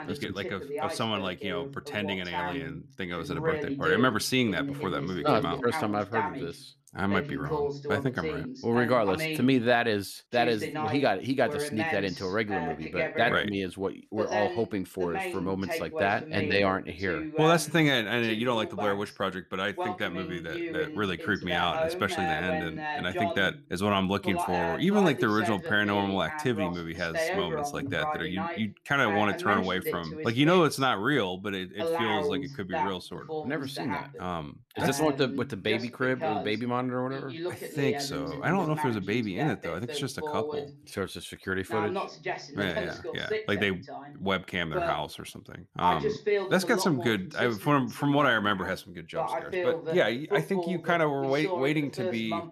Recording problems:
voice in the background; loud; throughout; 5 dB below the speech

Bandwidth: 13.5 kHz